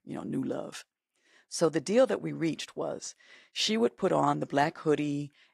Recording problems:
garbled, watery; slightly; nothing above 14.5 kHz

